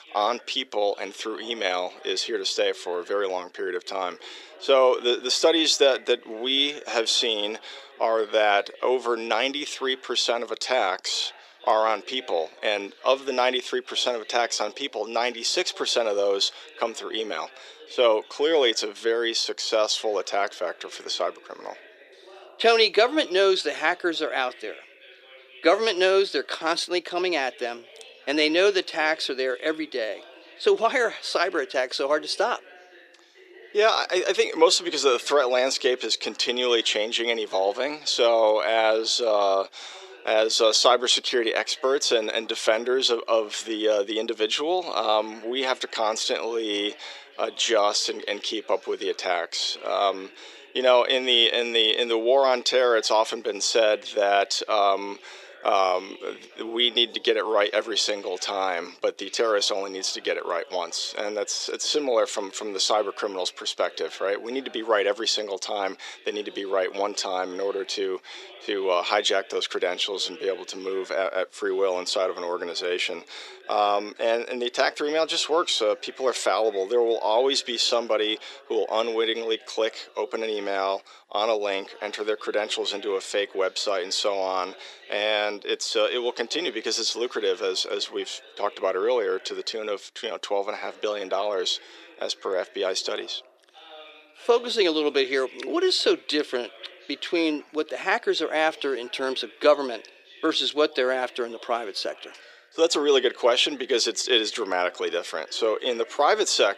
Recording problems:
thin; very; fading below 350 Hz
voice in the background; faint; throughout; 25 dB below the speech

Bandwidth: 14.5 kHz